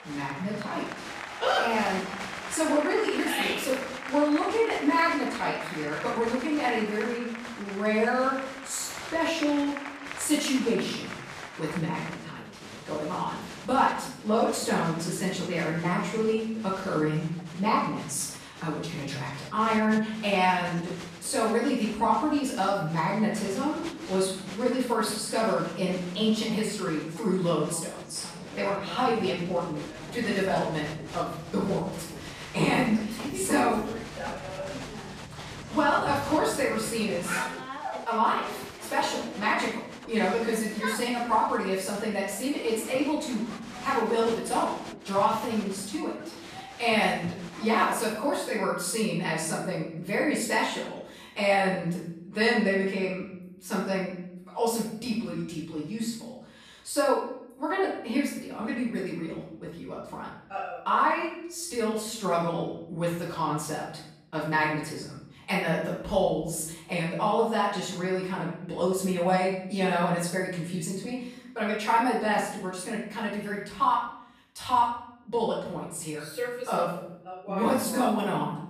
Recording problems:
off-mic speech; far
room echo; noticeable; dies away in 0.7 s
crowd noise; noticeable; until 48 s; 10 dB below the speech

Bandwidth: 14.5 kHz